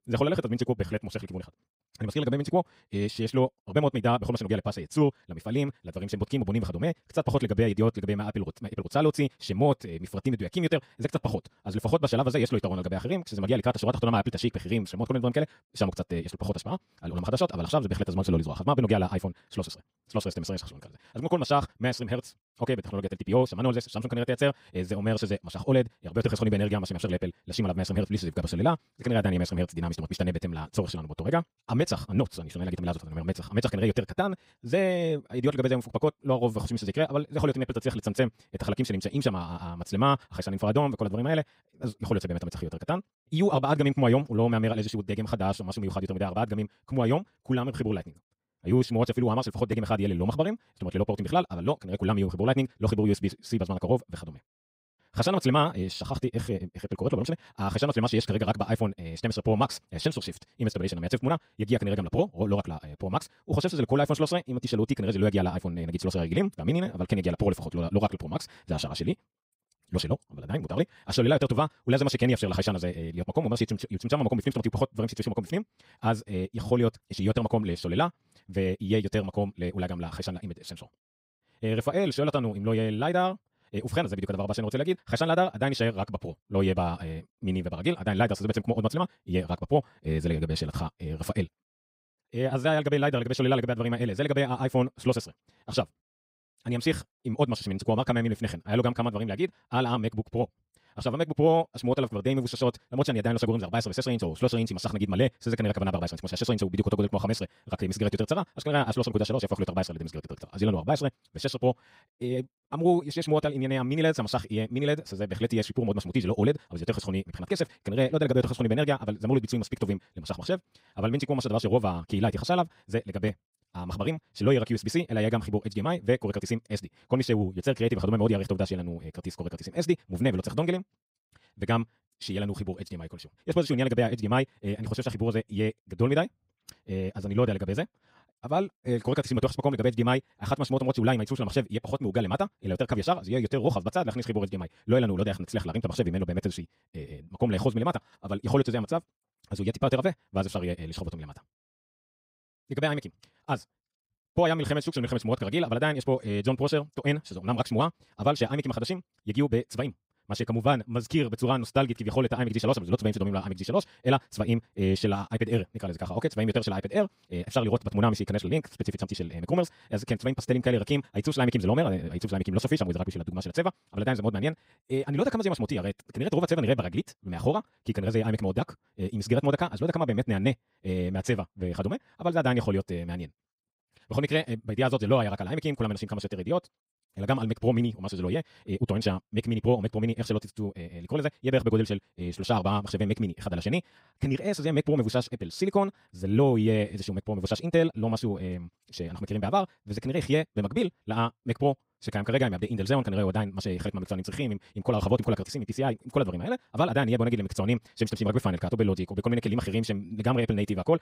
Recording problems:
wrong speed, natural pitch; too fast; 1.8 times normal speed

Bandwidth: 15.5 kHz